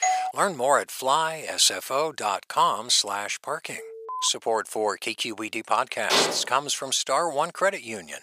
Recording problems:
thin; very; fading below 650 Hz
doorbell; noticeable; at the start; peak level with the speech
alarm; noticeable; at 4 s; peak 9 dB below the speech
clattering dishes; loud; at 6 s; peak 2 dB above the speech

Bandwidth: 15 kHz